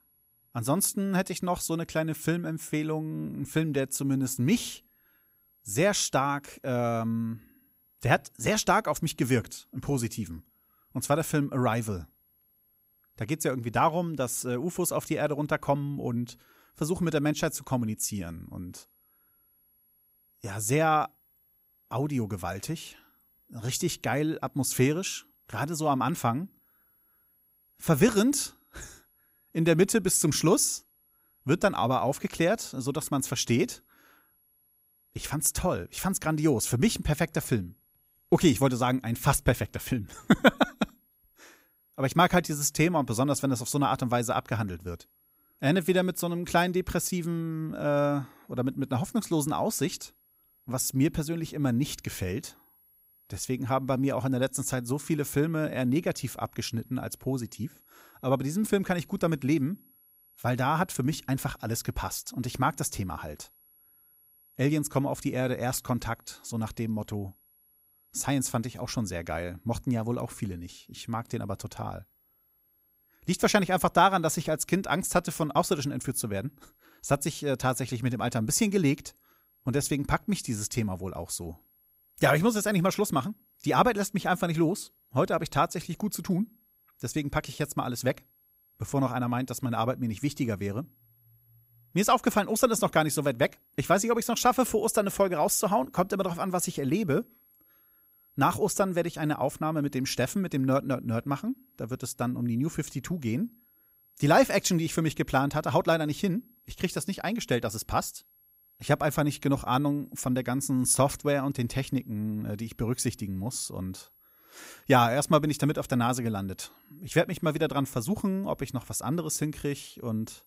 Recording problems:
high-pitched whine; faint; throughout; 11.5 kHz, 35 dB below the speech

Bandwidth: 15.5 kHz